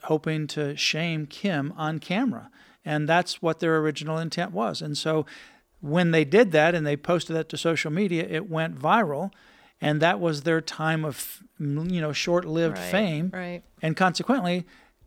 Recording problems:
none

